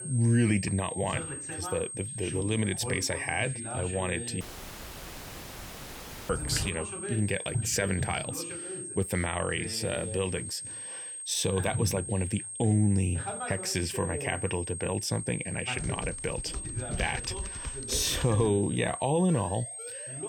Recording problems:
high-pitched whine; loud; throughout; 8.5 kHz, 7 dB below the speech
voice in the background; loud; throughout; 10 dB below the speech
audio cutting out; at 4.5 s for 2 s
dog barking; noticeable; at 6.5 s; peak 7 dB below the speech
keyboard typing; noticeable; from 16 to 18 s; peak 9 dB below the speech
siren; faint; from 19 s on; peak 15 dB below the speech

